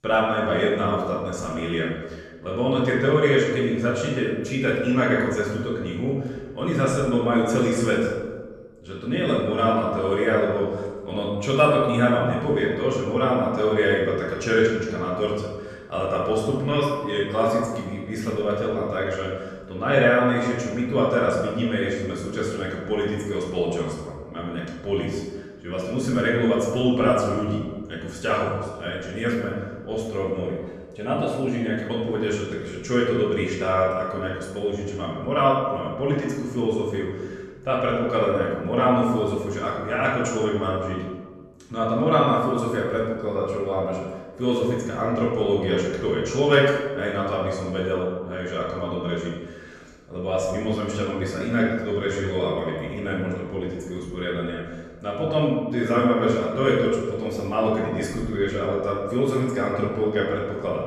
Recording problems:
off-mic speech; far
room echo; noticeable; dies away in 1.1 s

